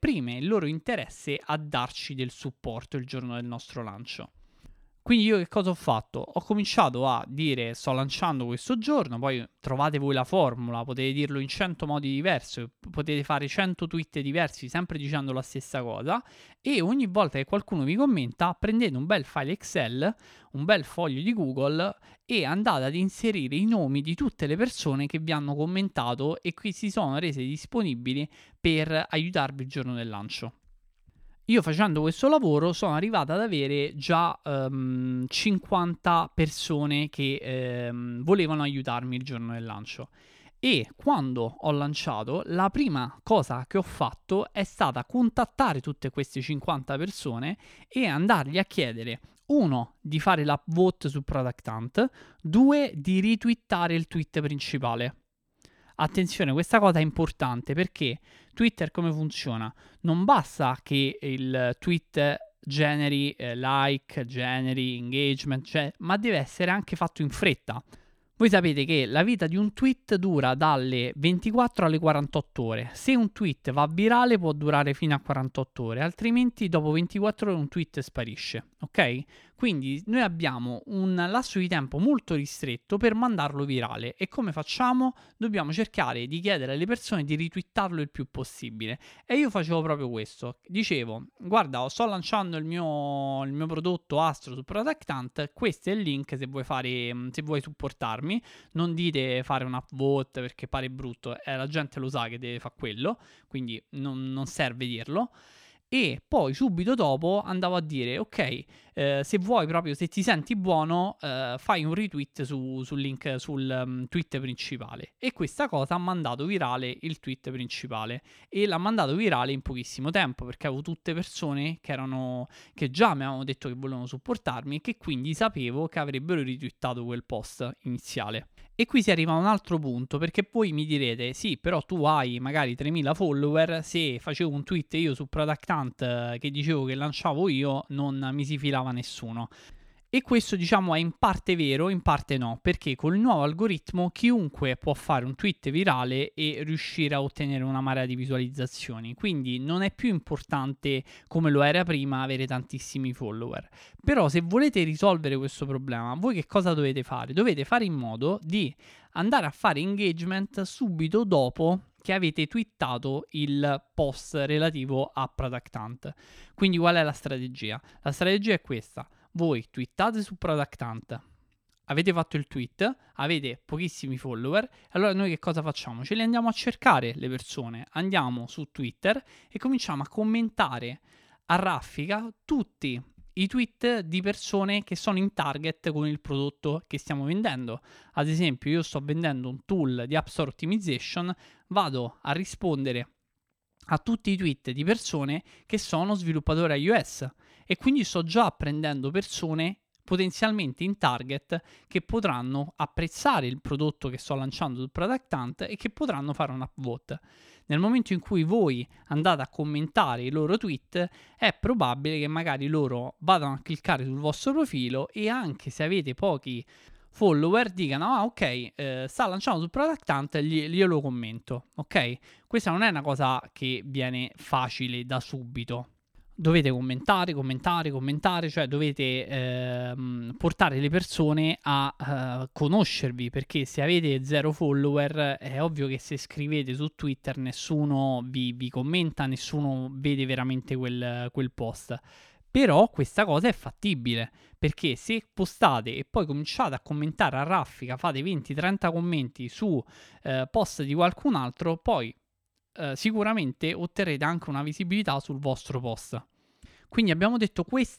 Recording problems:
none

